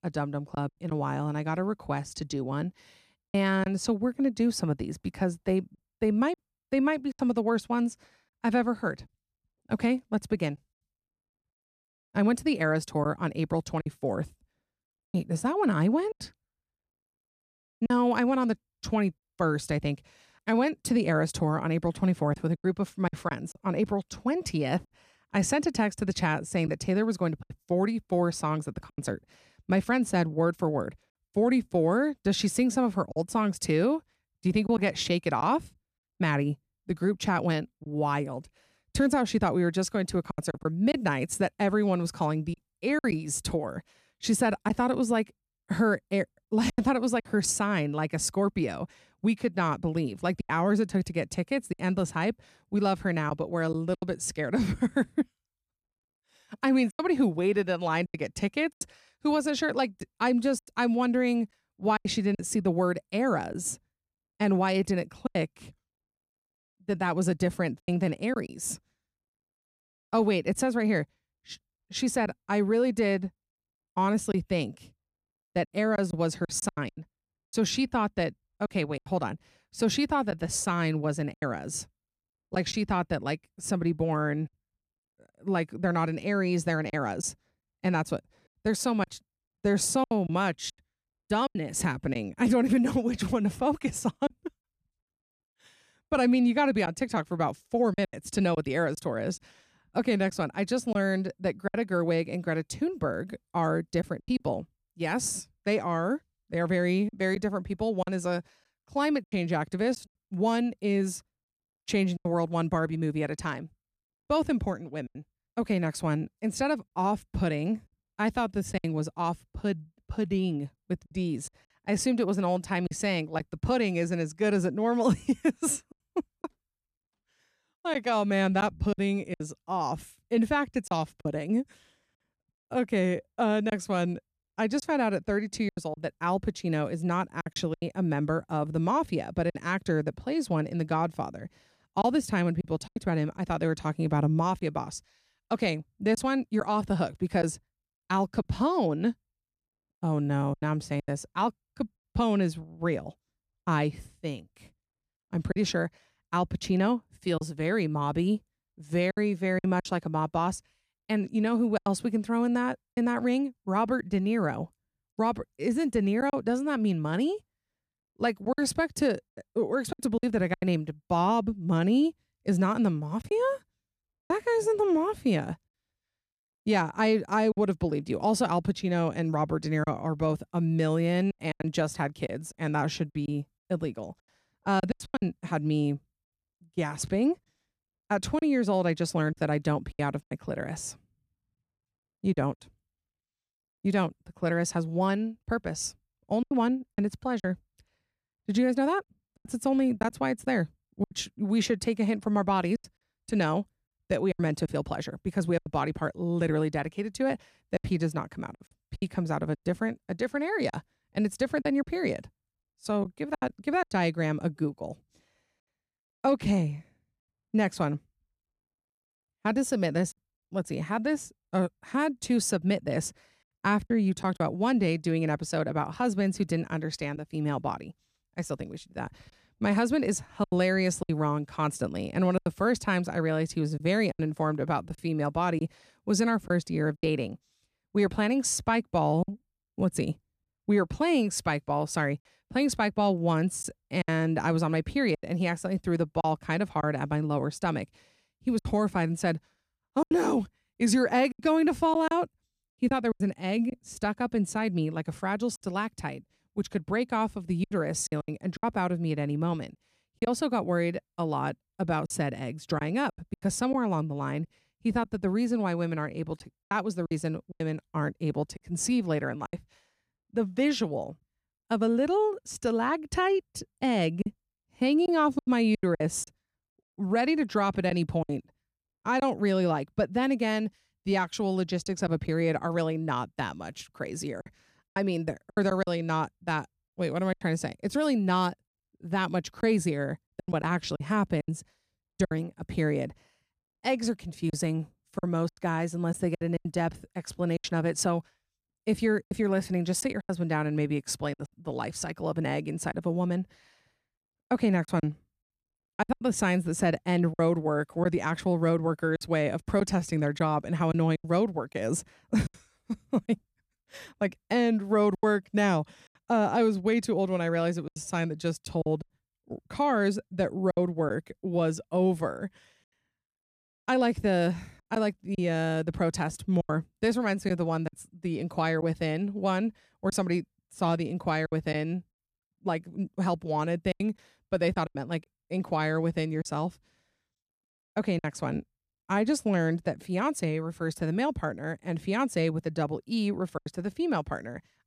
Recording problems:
choppy; very; 5% of the speech affected

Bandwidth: 14.5 kHz